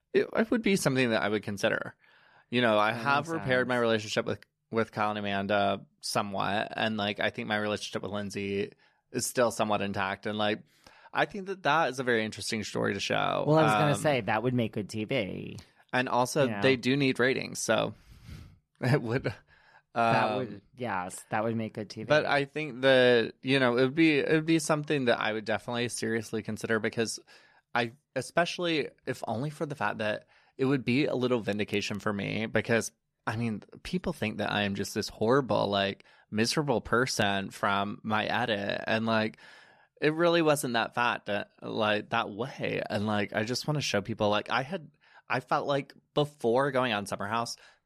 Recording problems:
none

